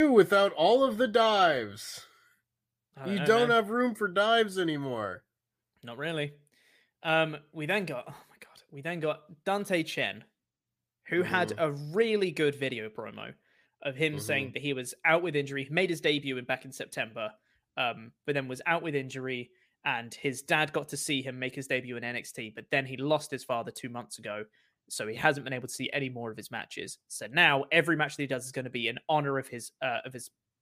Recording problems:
abrupt cut into speech; at the start

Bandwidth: 15 kHz